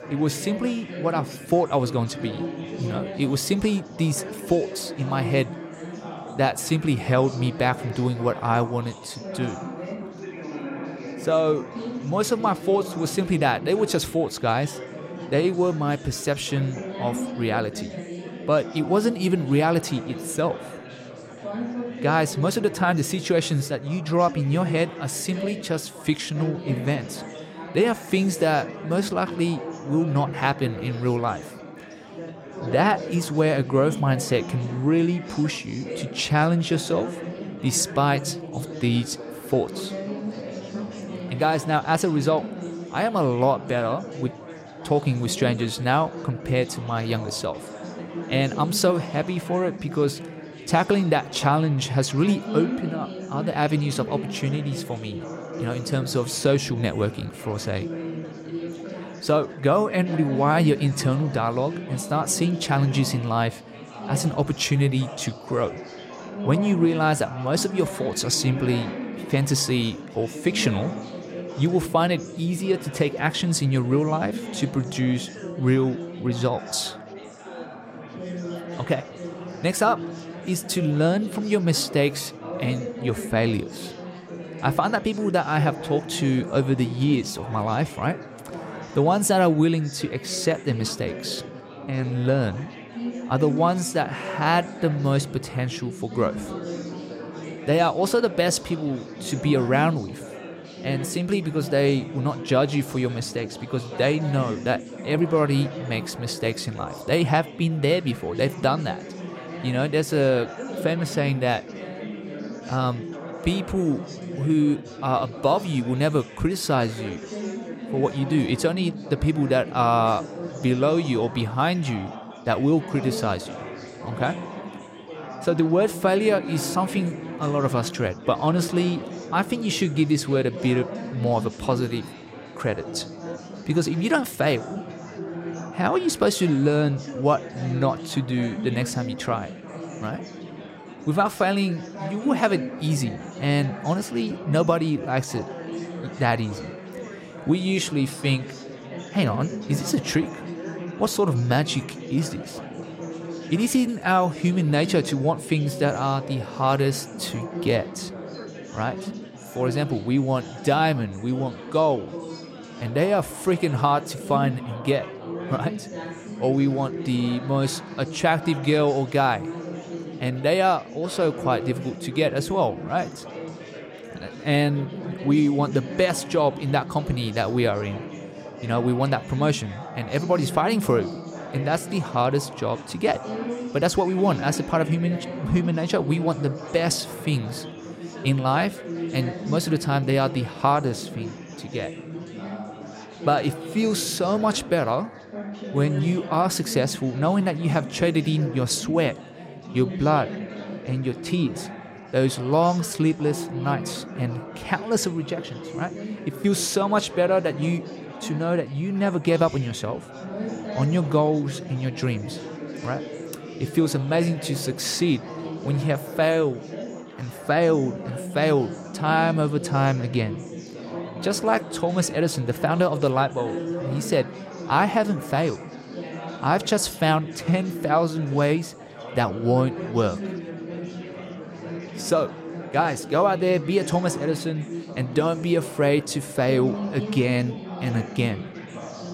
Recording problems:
chatter from many people; noticeable; throughout; 10 dB below the speech

